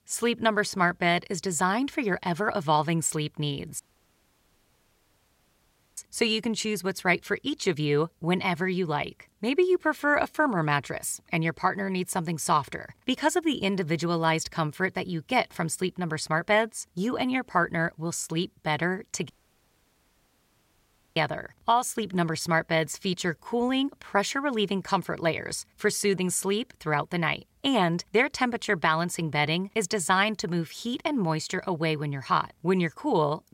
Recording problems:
audio cutting out; at 4 s for 2 s and at 19 s for 2 s

